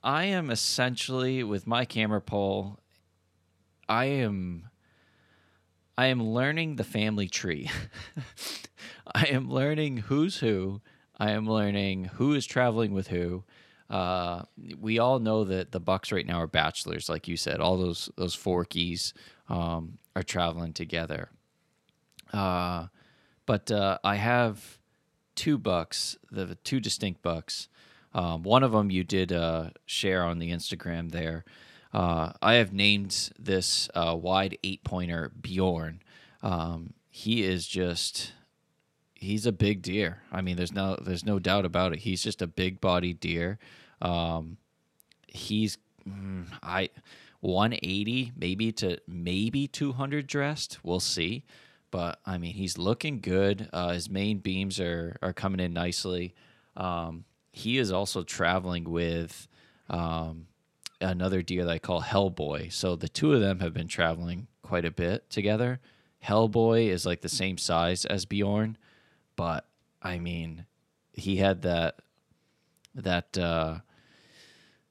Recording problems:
none

